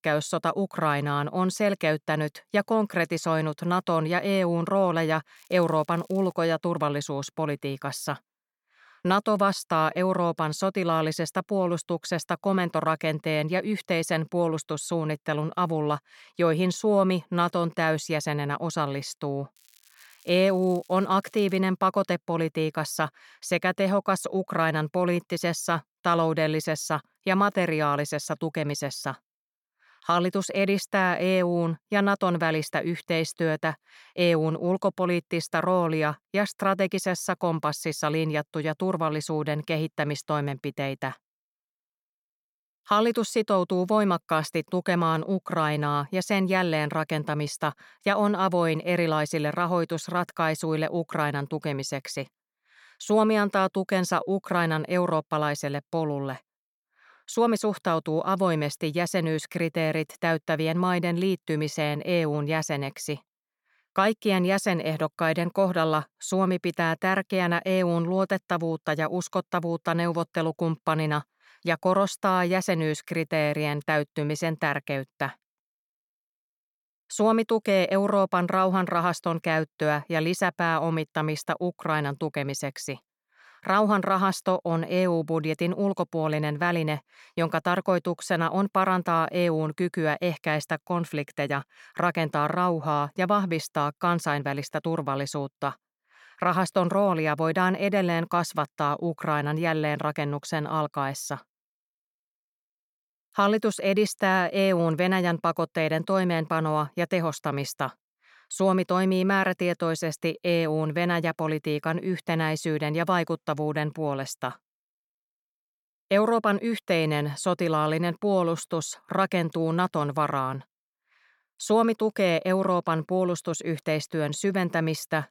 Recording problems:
crackling; faint; at 5.5 s and from 20 to 22 s; 30 dB below the speech

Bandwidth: 17 kHz